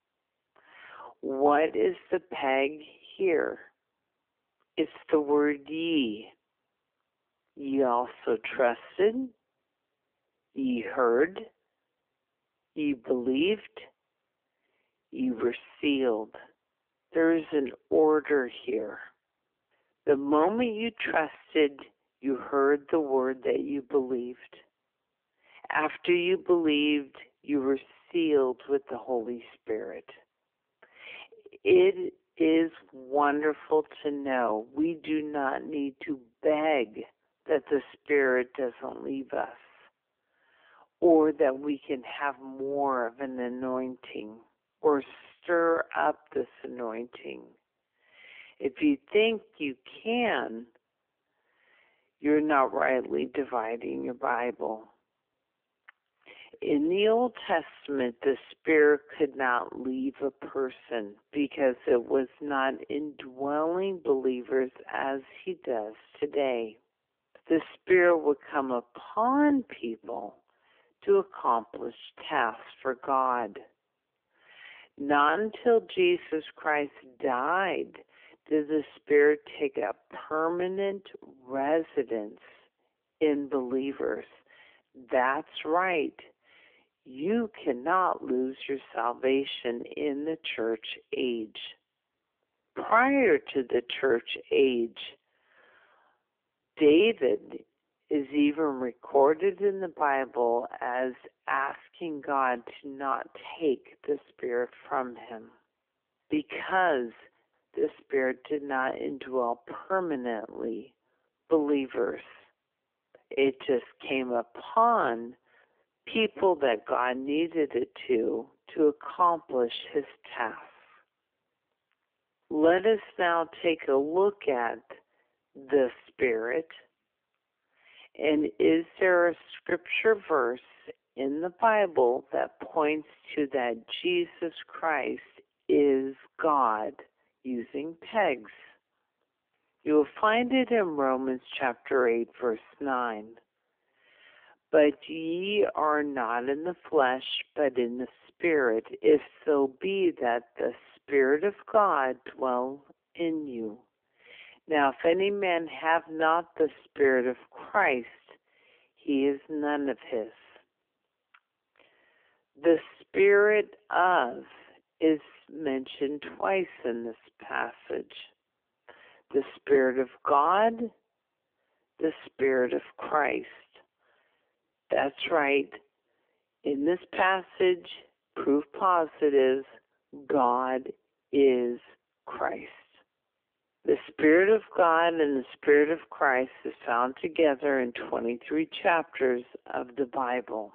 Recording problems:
wrong speed, natural pitch; too slow; 0.6 times normal speed
phone-call audio; nothing above 3.5 kHz

